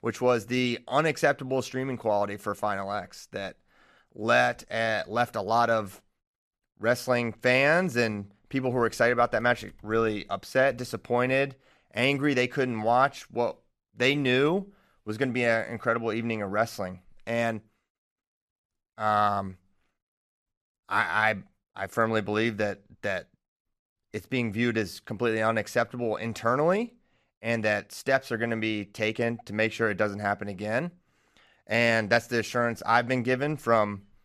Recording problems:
none

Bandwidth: 14.5 kHz